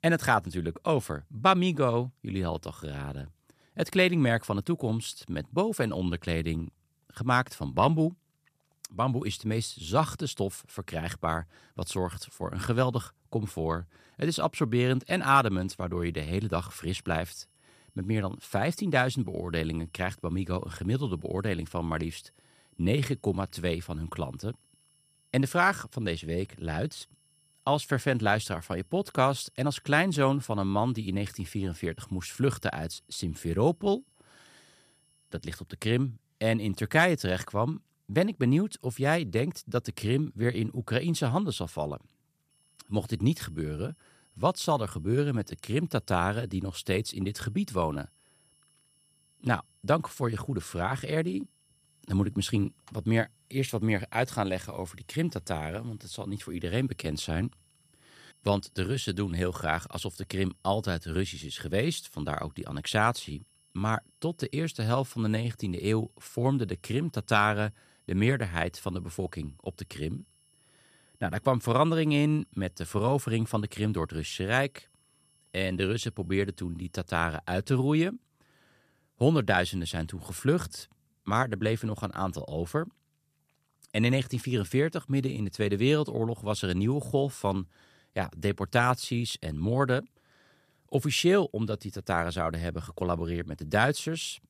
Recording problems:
high-pitched whine; faint; from 16 to 36 s and from 43 s to 1:17; 11 kHz, 35 dB below the speech

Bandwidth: 14.5 kHz